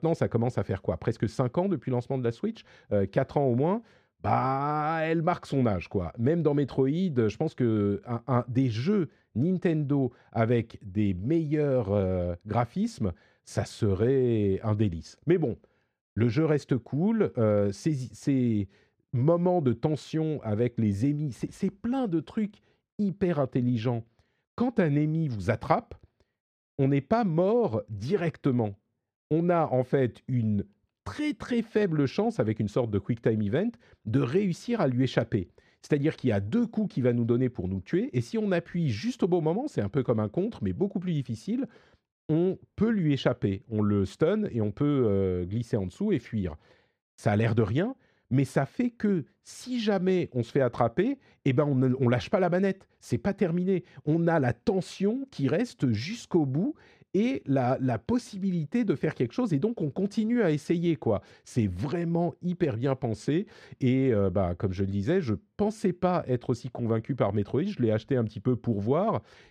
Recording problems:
muffled; very; fading above 2.5 kHz

